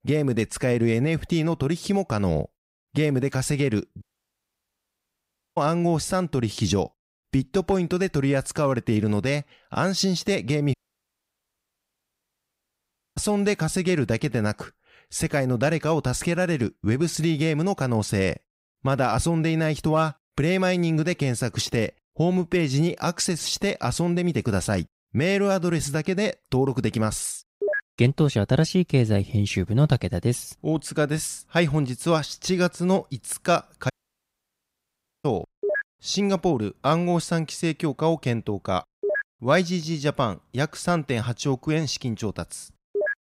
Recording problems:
audio cutting out; at 4 s for 1.5 s, at 11 s for 2.5 s and at 34 s for 1.5 s

